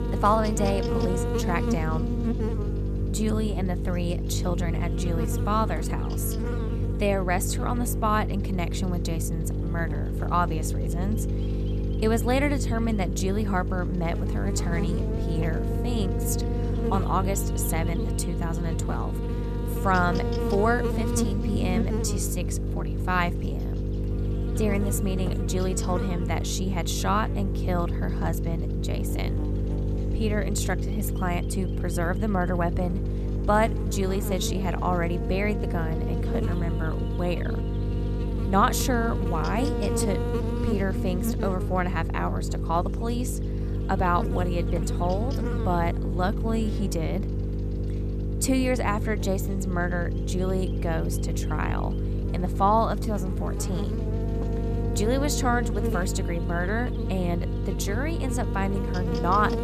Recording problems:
electrical hum; loud; throughout; 50 Hz, 7 dB below the speech

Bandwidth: 14.5 kHz